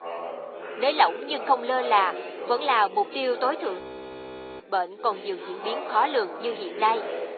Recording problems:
thin; very; fading below 350 Hz
high frequencies cut off; severe; nothing above 4.5 kHz
garbled, watery; slightly
background chatter; noticeable; throughout; 4 voices, 10 dB below the speech
audio freezing; at 4 s for 1 s

